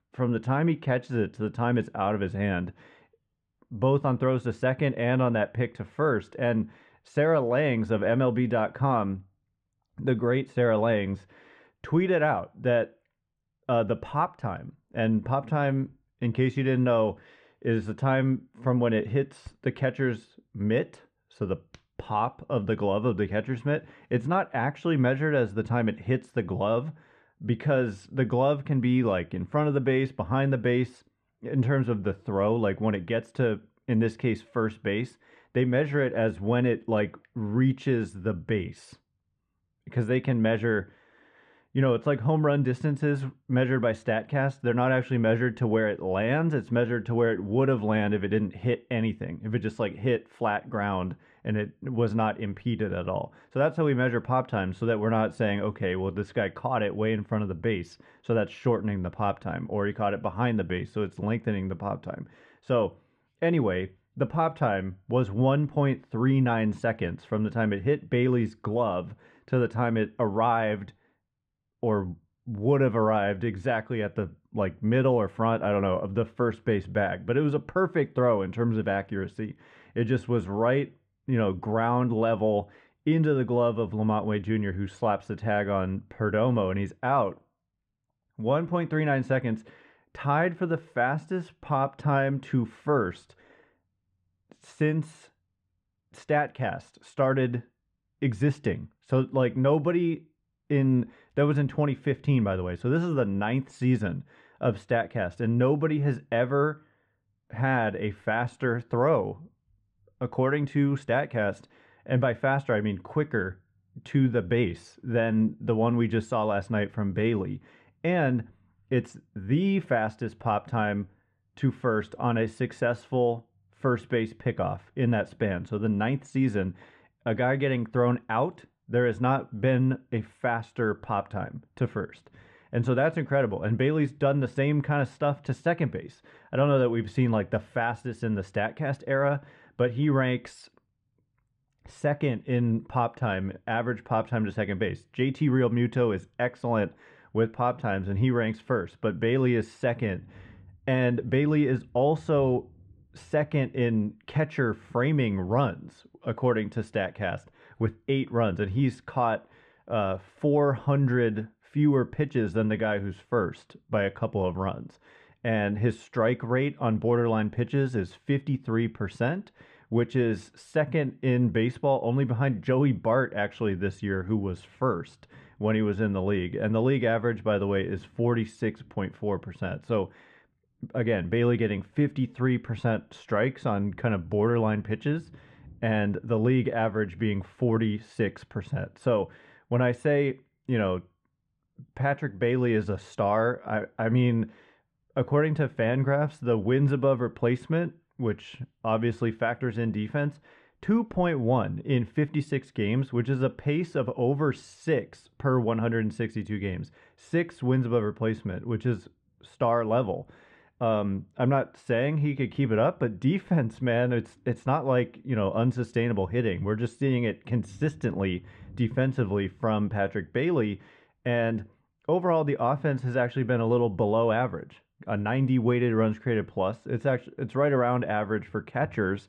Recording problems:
muffled; very; fading above 2 kHz

